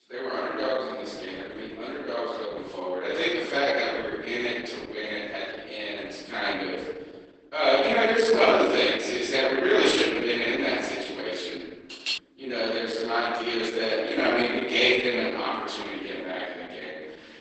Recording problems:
room echo; strong; dies away in 1.4 s
off-mic speech; far
garbled, watery; badly; nothing above 8 kHz
thin; very slightly; fading below 300 Hz
clattering dishes; noticeable; at 12 s; peak 4 dB below the speech

